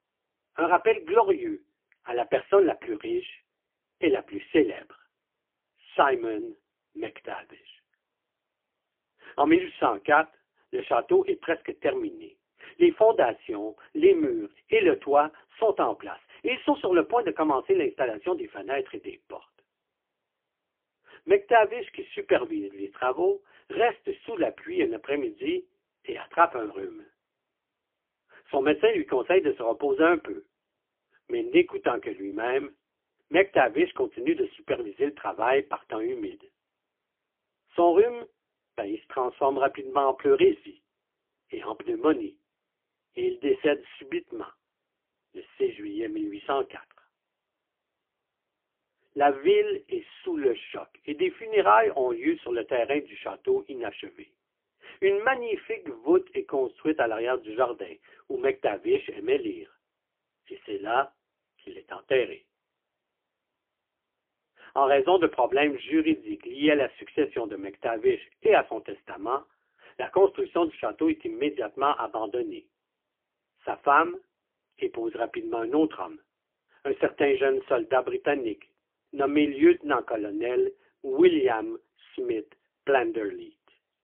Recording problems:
phone-call audio; poor line; nothing above 3 kHz

